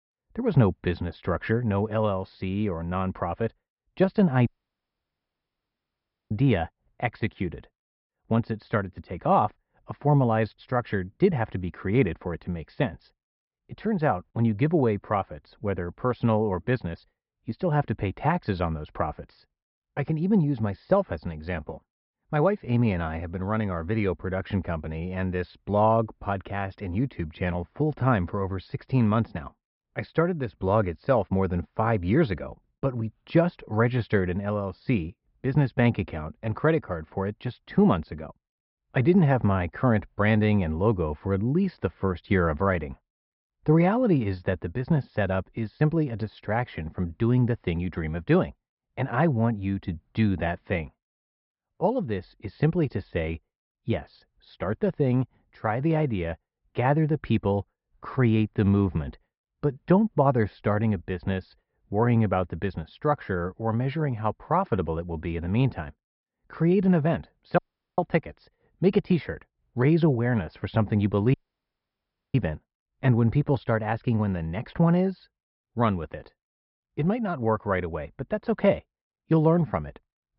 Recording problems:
high frequencies cut off; noticeable; nothing above 5.5 kHz
muffled; very slightly; fading above 2 kHz
audio cutting out; at 4.5 s for 2 s, at 1:08 and at 1:11 for 1 s

